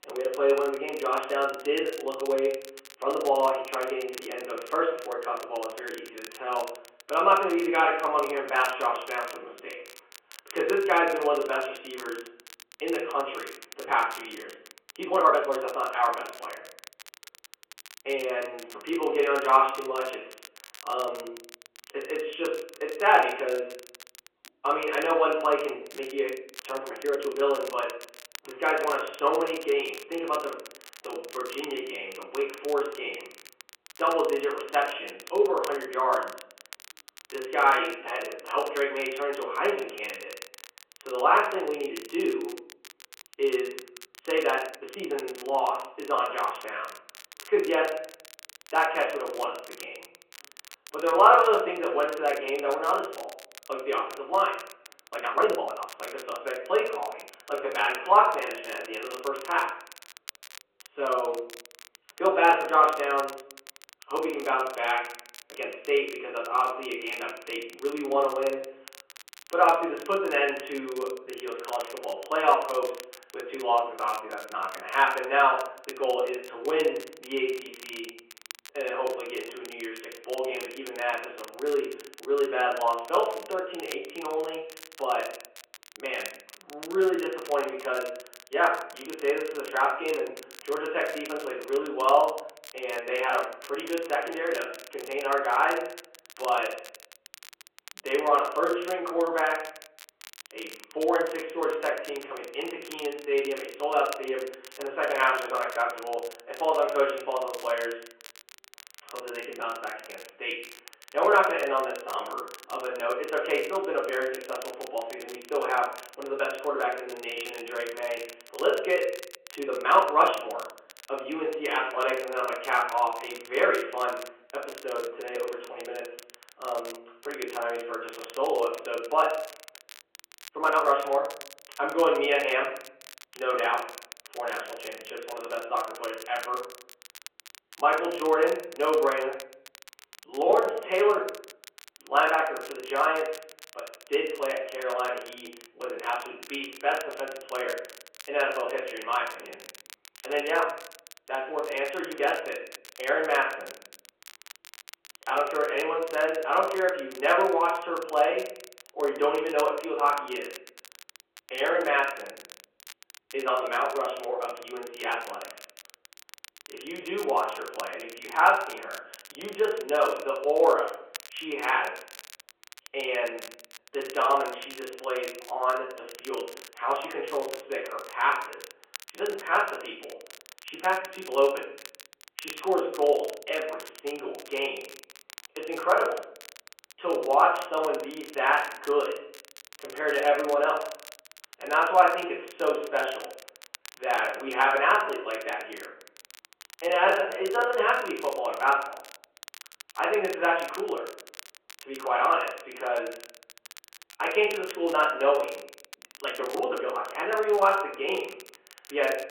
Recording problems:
off-mic speech; far
room echo; noticeable; dies away in 0.5 s
phone-call audio
crackle, like an old record; noticeable; 20 dB below the speech
uneven, jittery; strongly; from 6 s to 3:27

